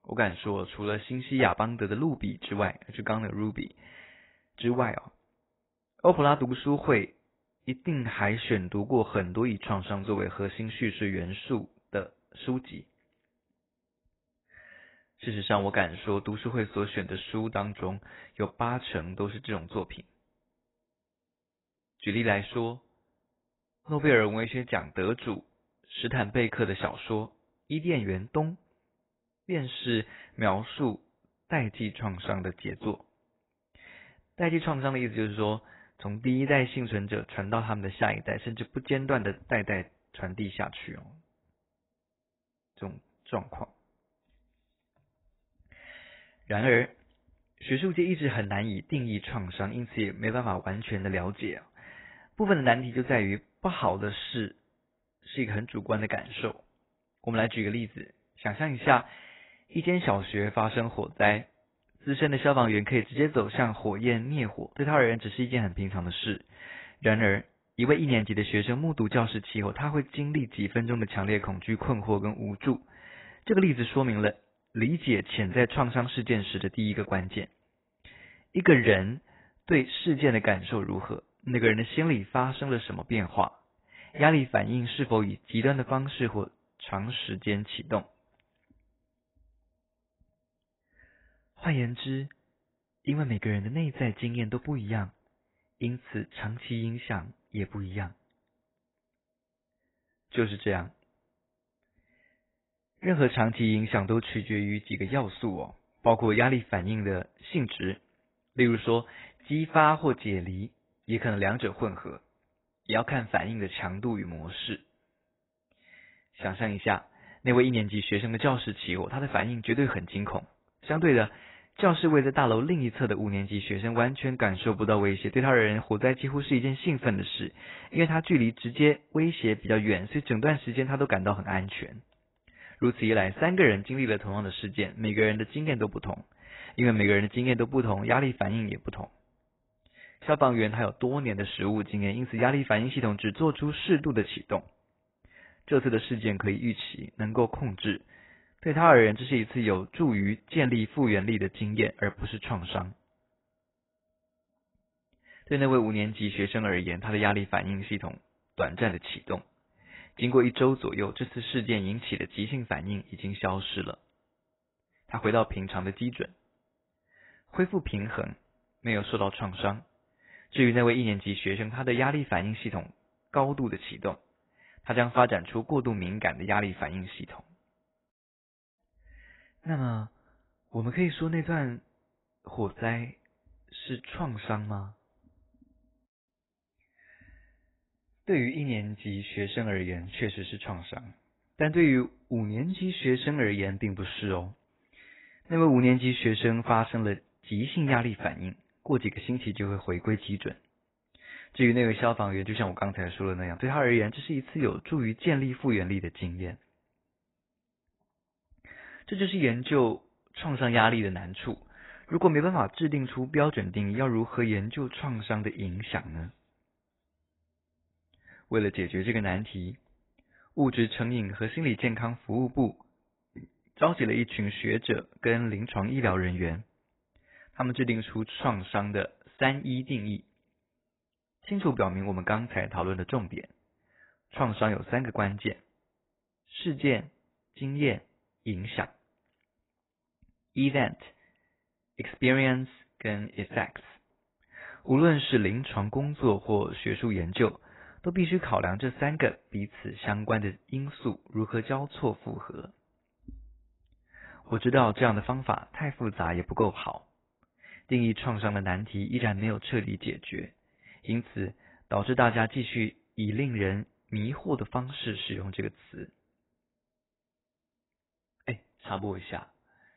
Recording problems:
garbled, watery; badly; nothing above 4 kHz

